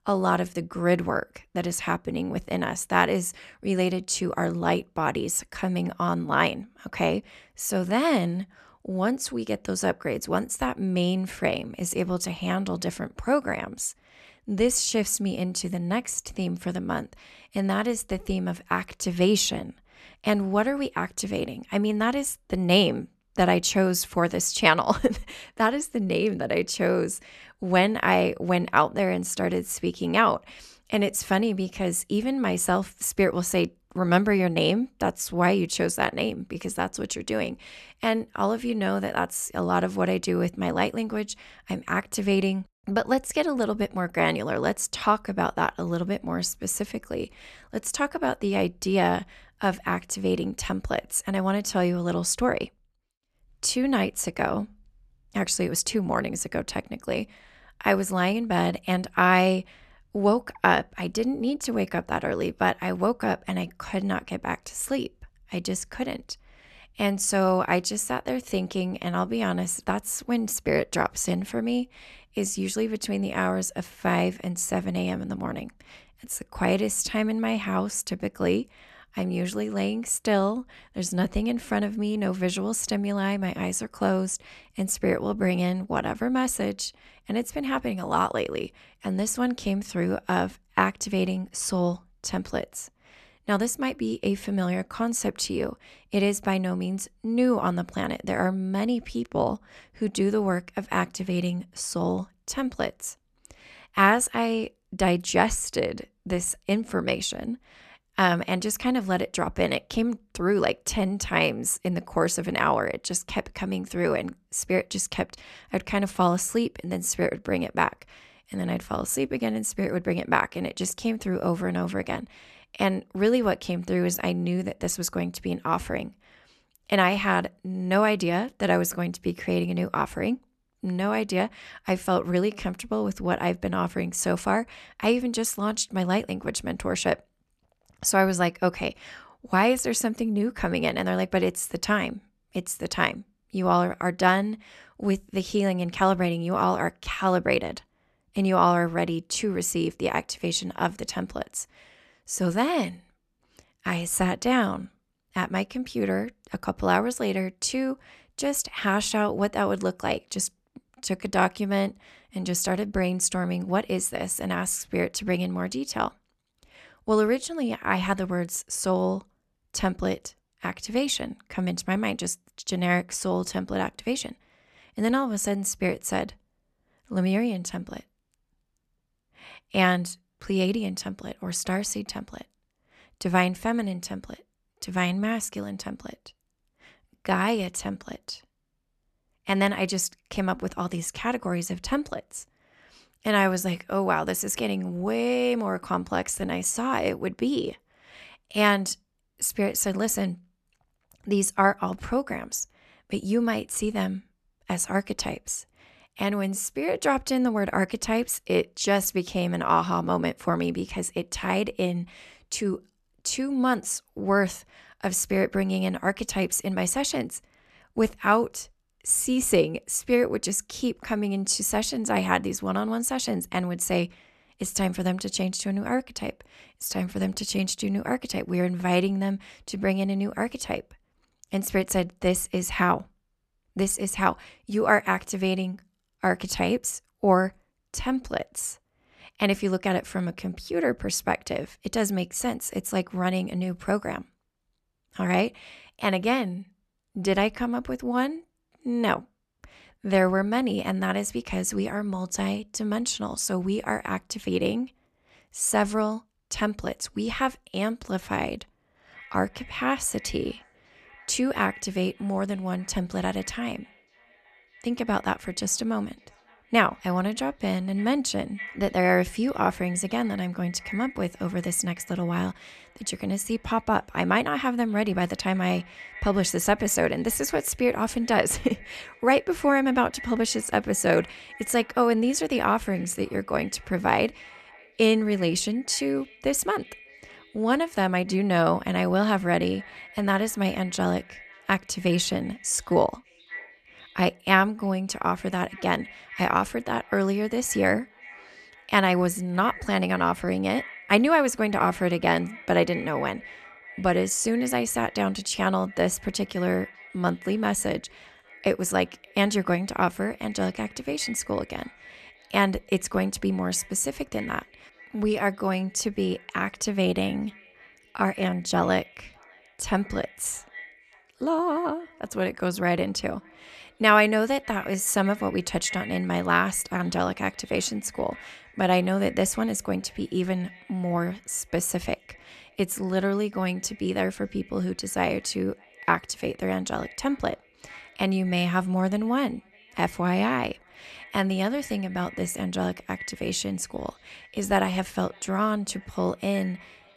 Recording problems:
echo of what is said; faint; from 4:19 on; 600 ms later, 20 dB below the speech

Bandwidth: 13.5 kHz